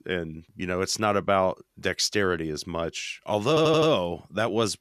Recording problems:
audio stuttering; at 3.5 s

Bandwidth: 14.5 kHz